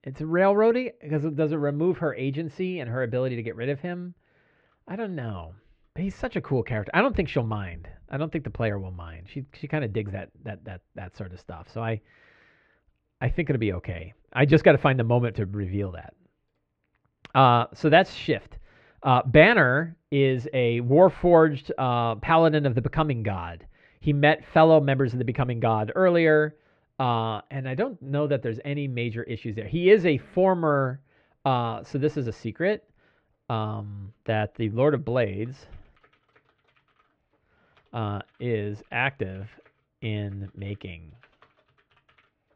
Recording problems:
muffled; very; fading above 2.5 kHz

